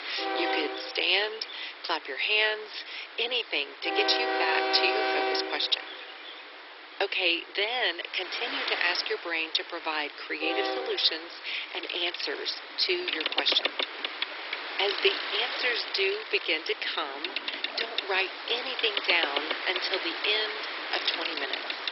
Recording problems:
garbled, watery; badly; nothing above 5.5 kHz
thin; very; fading below 300 Hz
train or aircraft noise; loud; throughout; 4 dB below the speech

